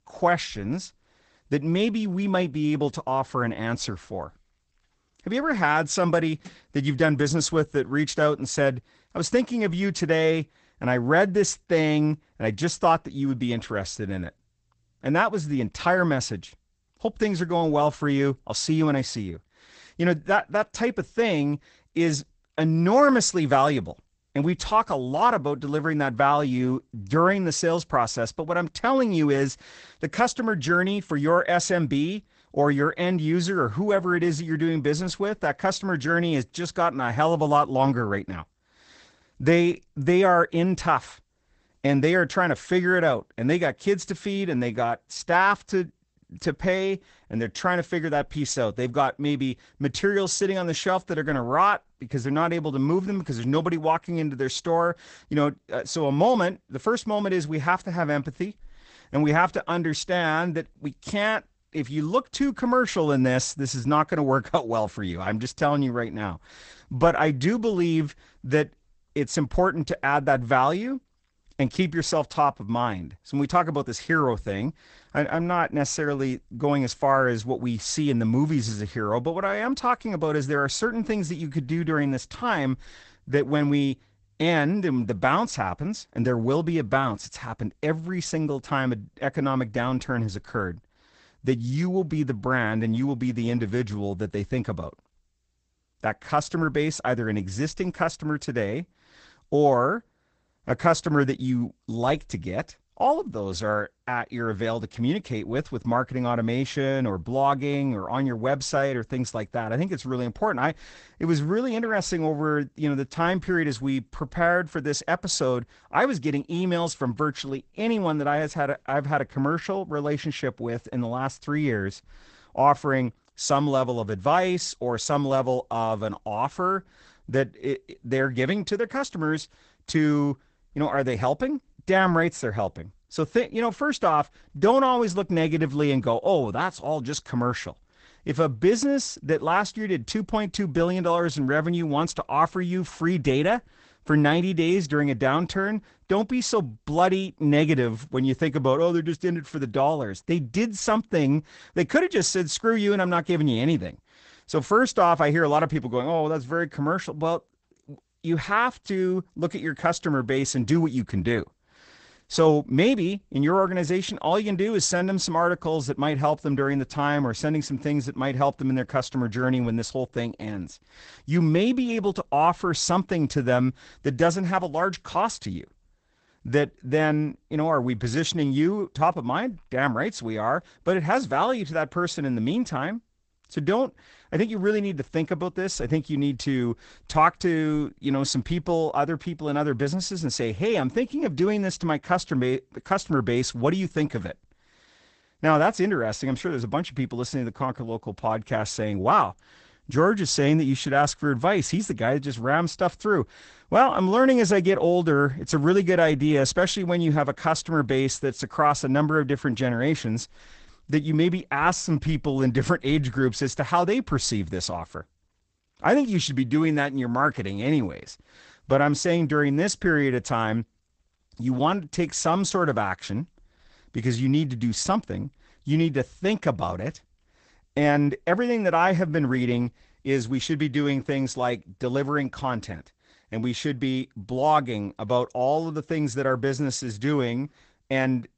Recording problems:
garbled, watery; badly; nothing above 8 kHz

